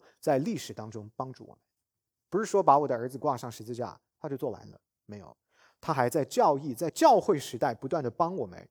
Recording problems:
none

